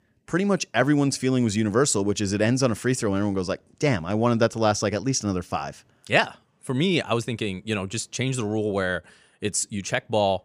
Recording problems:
none

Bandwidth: 15 kHz